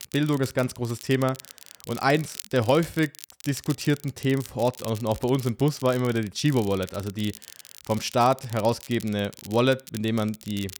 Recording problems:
crackle, like an old record; noticeable; 15 dB below the speech

